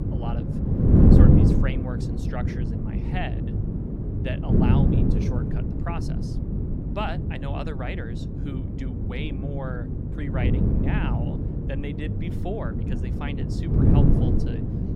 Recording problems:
wind noise on the microphone; heavy; 3 dB above the speech
electrical hum; noticeable; throughout; 50 Hz, 10 dB below the speech

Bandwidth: 16 kHz